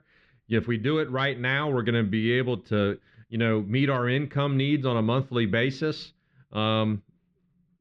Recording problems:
muffled; slightly; fading above 3.5 kHz

